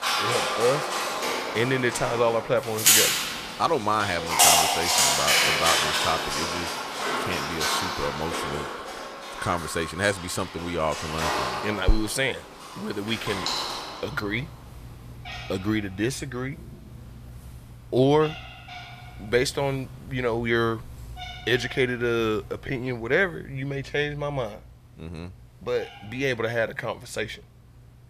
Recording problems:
animal sounds; very loud; throughout; 3 dB above the speech

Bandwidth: 14.5 kHz